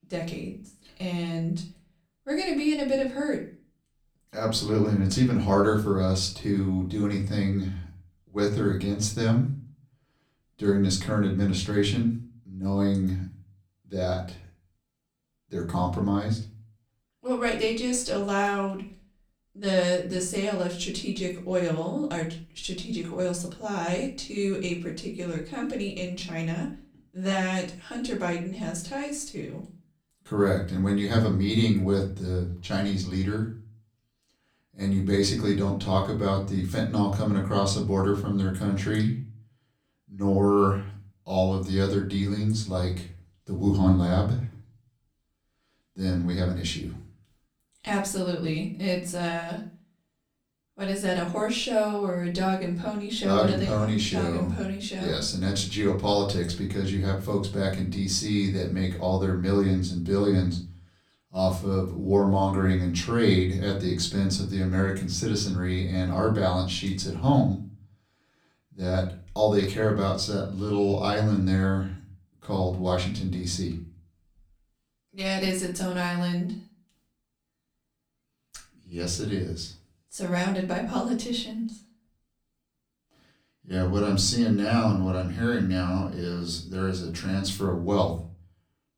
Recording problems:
off-mic speech; far
room echo; slight; dies away in 0.4 s

